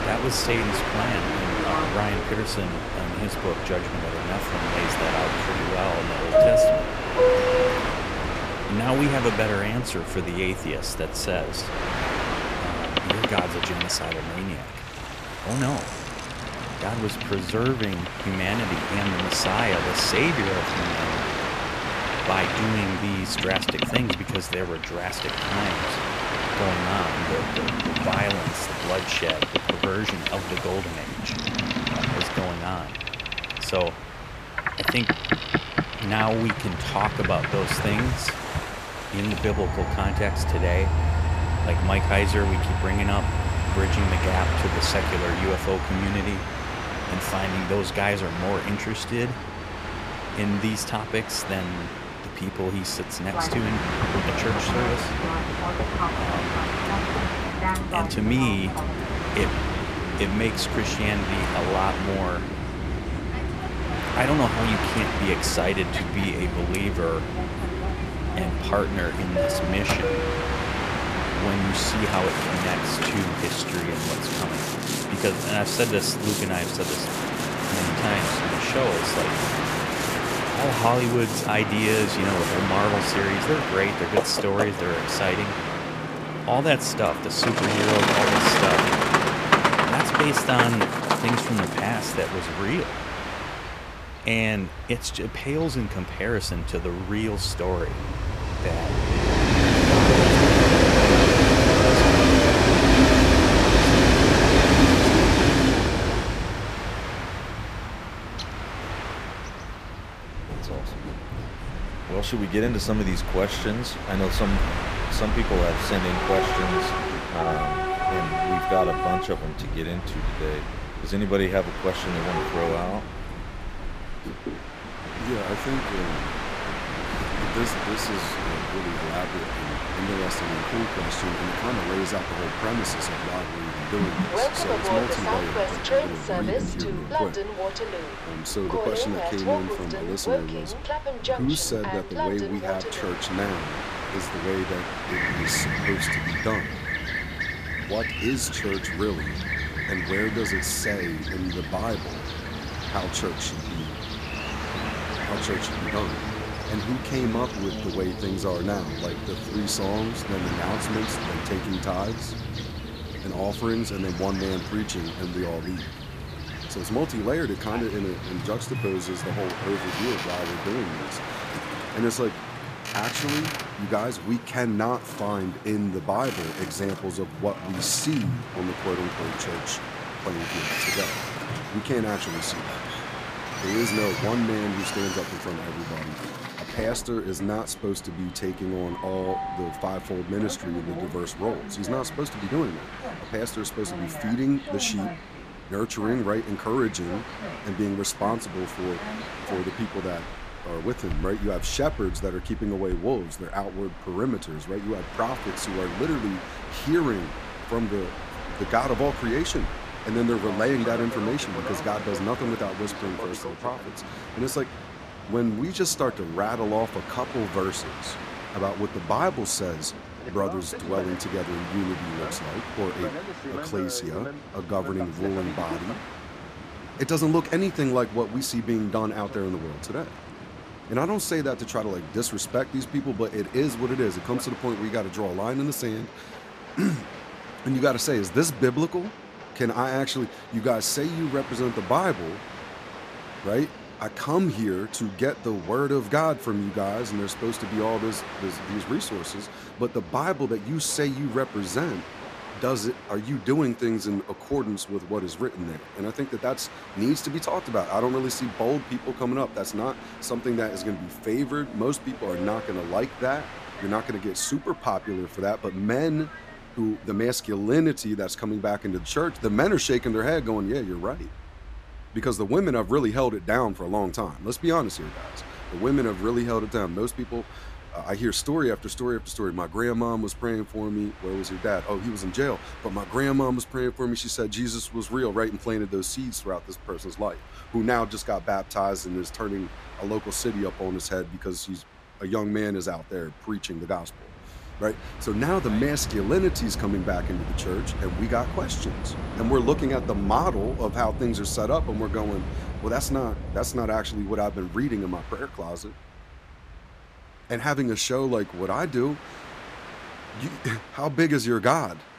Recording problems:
train or aircraft noise; very loud; throughout; 1 dB above the speech

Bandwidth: 14.5 kHz